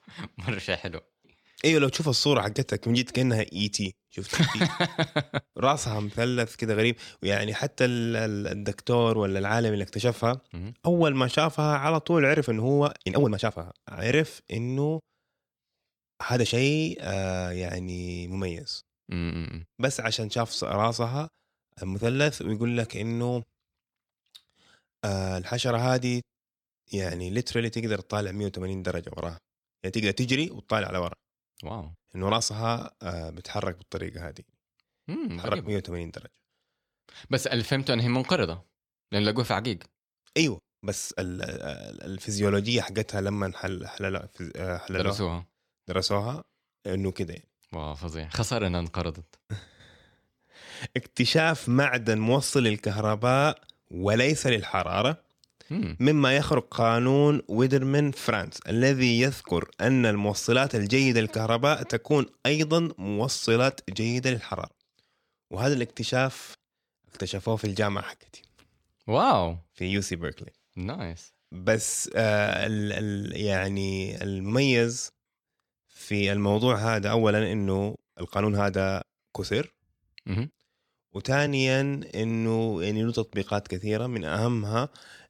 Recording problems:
uneven, jittery; strongly; from 4 s to 1:22

